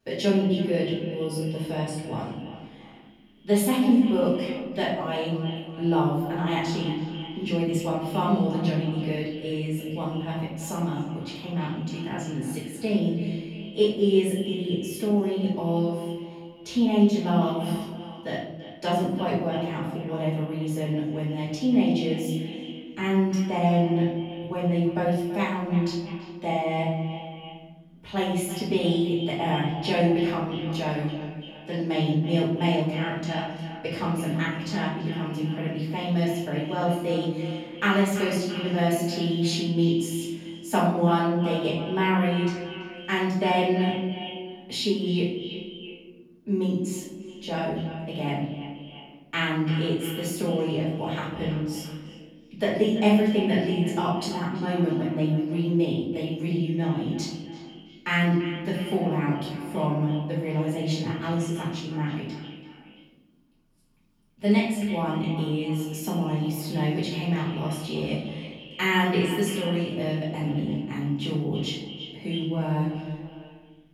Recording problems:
echo of what is said; strong; throughout; 330 ms later, 10 dB below the speech
off-mic speech; far
room echo; noticeable; dies away in 0.8 s

